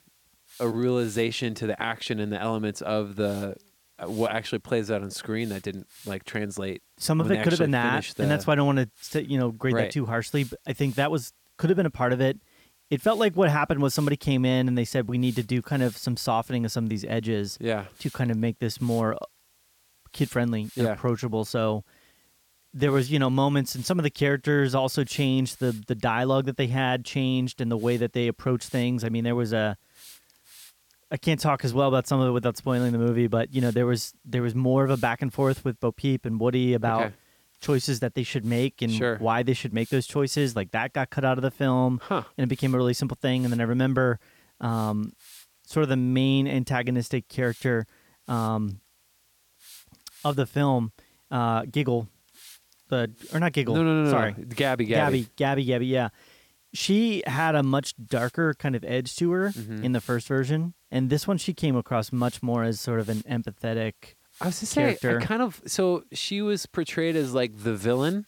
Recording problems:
hiss; faint; throughout; 25 dB below the speech

